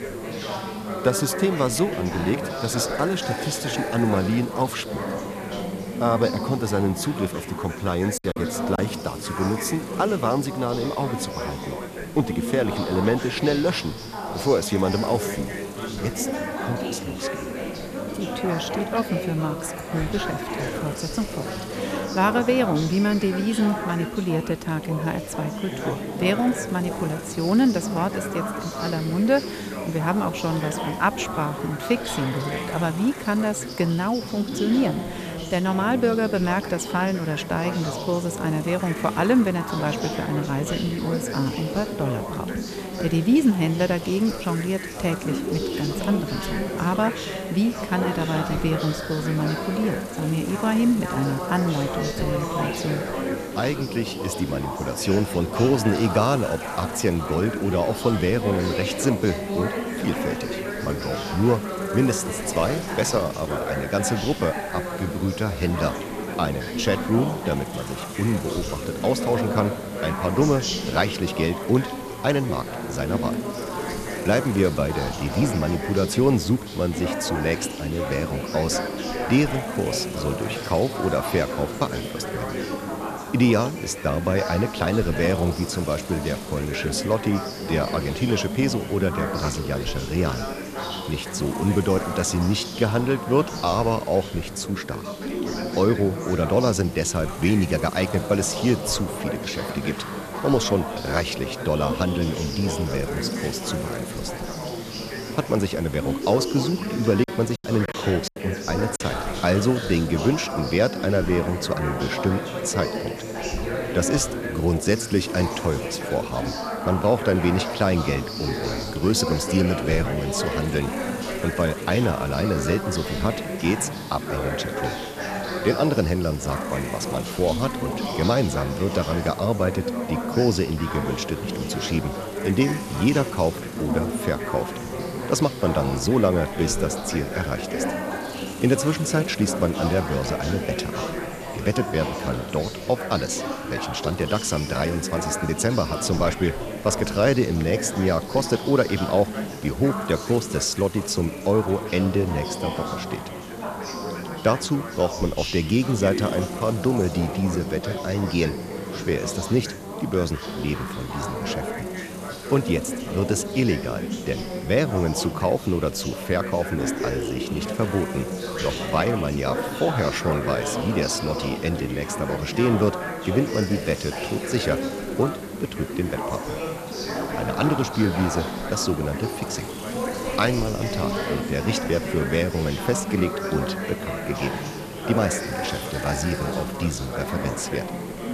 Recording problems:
background chatter; loud; throughout; 4 voices, 5 dB below the speech
hiss; noticeable; throughout; 15 dB below the speech
choppy; very; at 8 s and from 1:47 to 1:49; 10% of the speech affected

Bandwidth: 14.5 kHz